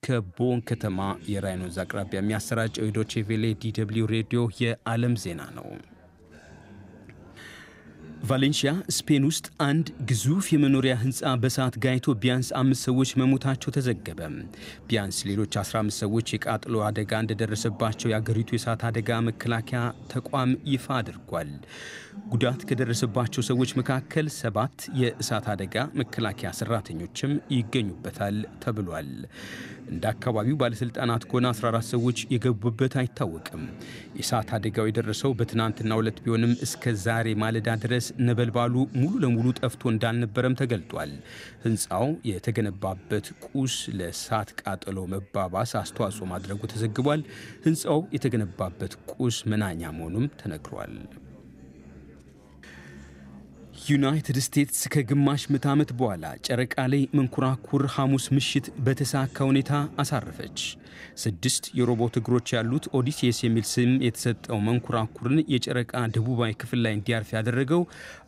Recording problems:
background chatter; noticeable; throughout; 3 voices, 20 dB below the speech

